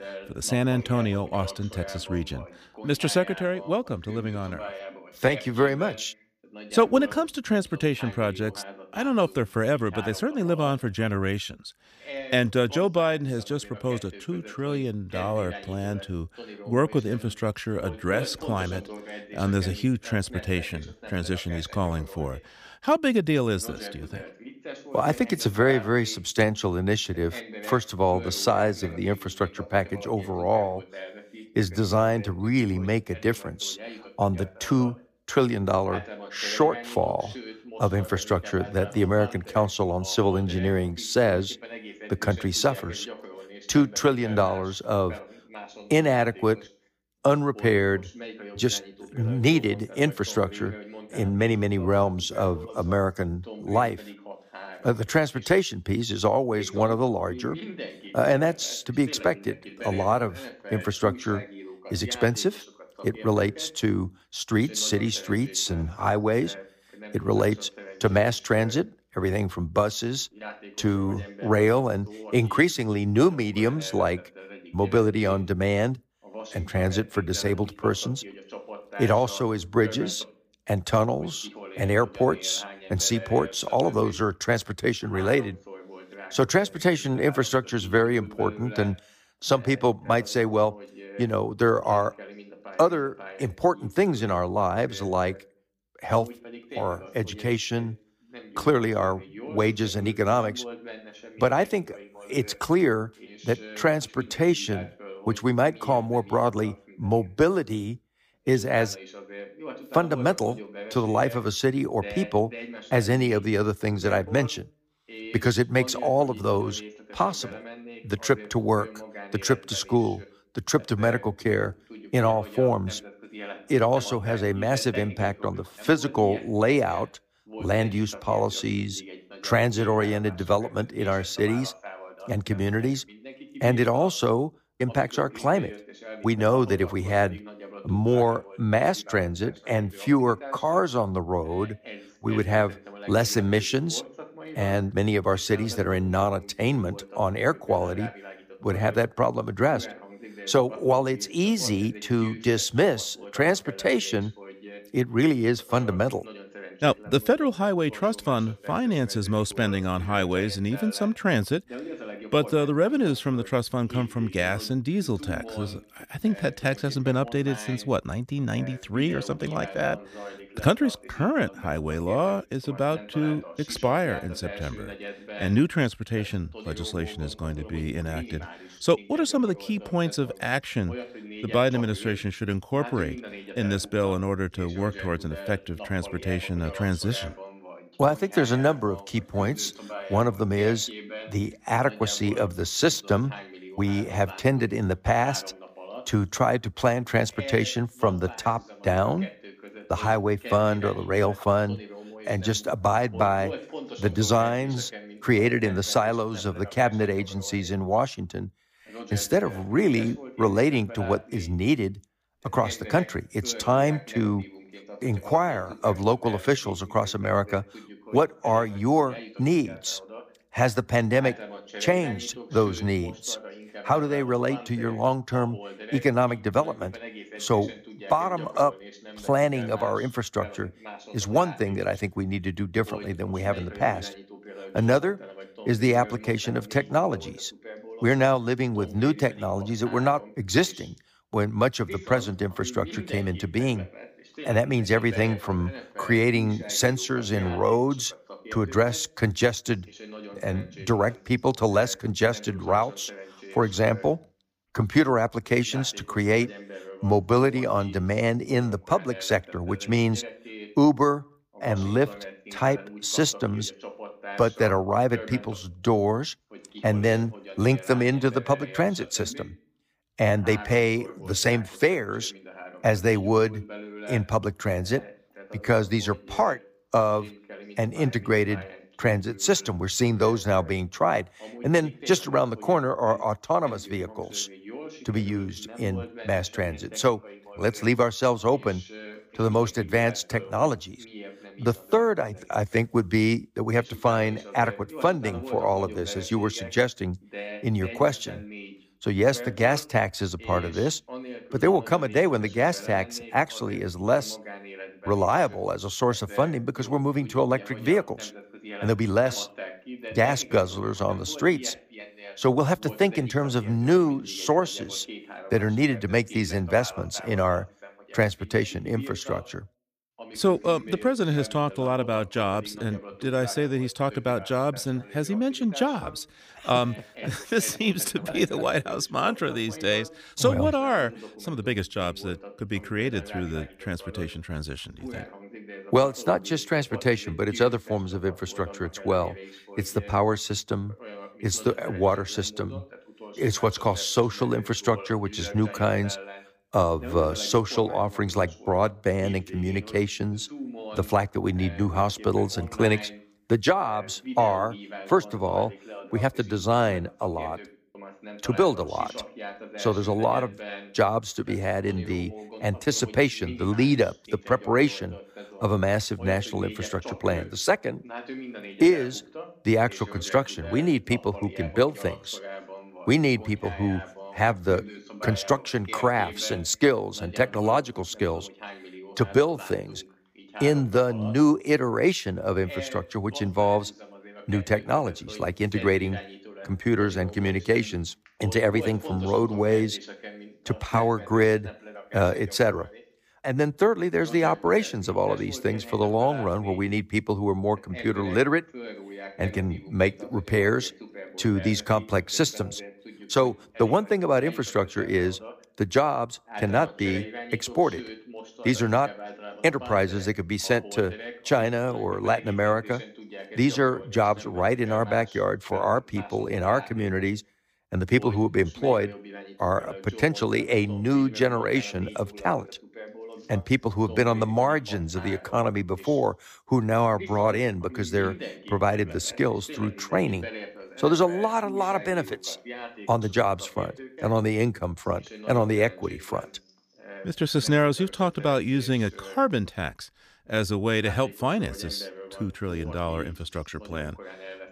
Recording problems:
voice in the background; noticeable; throughout; 15 dB below the speech

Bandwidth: 15 kHz